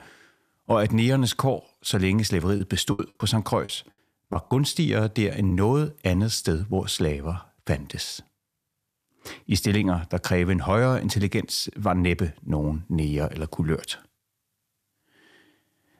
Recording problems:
choppy; very; from 2.5 to 5.5 s; 9% of the speech affected

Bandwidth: 14.5 kHz